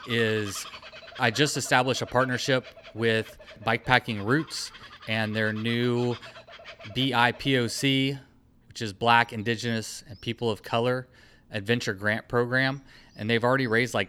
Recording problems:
animal sounds; noticeable; throughout; 20 dB below the speech

